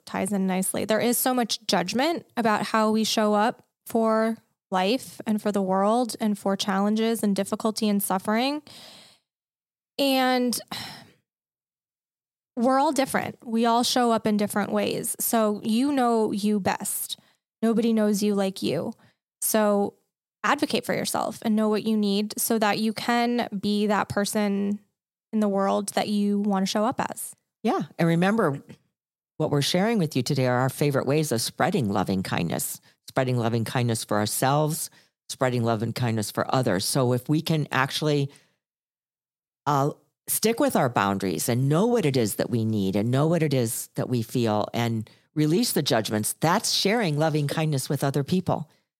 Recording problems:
none

